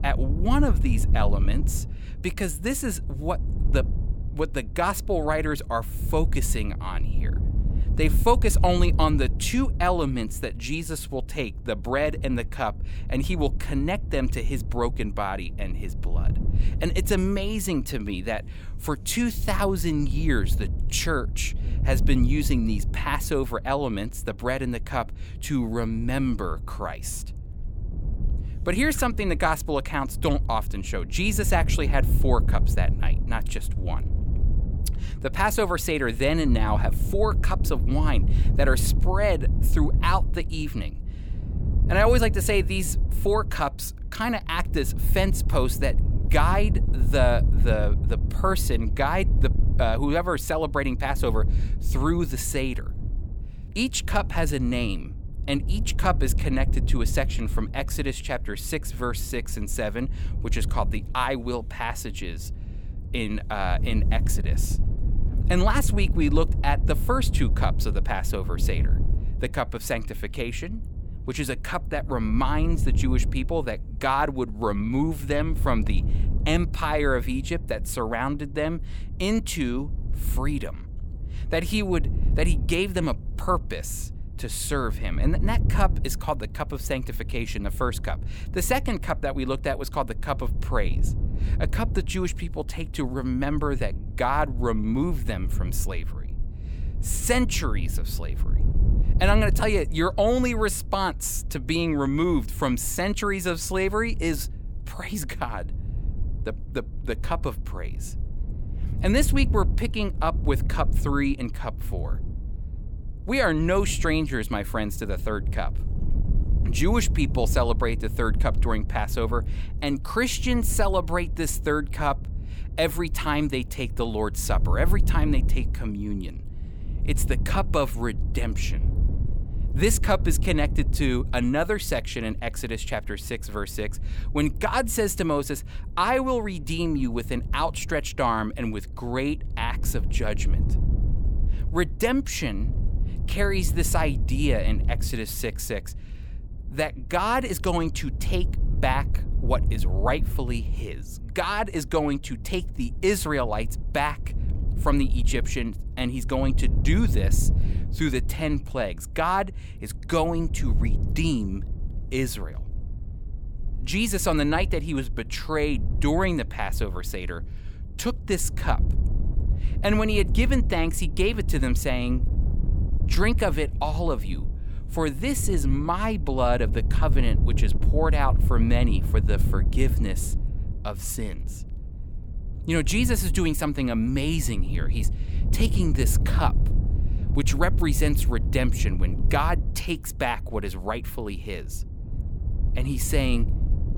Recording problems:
wind noise on the microphone; occasional gusts; 15 dB below the speech

